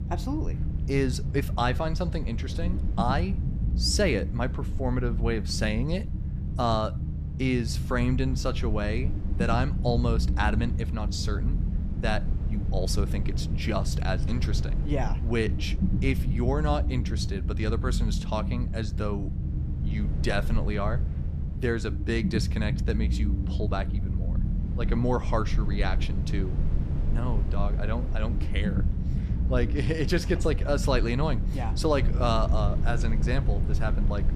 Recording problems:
low rumble; noticeable; throughout; 10 dB below the speech

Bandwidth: 14.5 kHz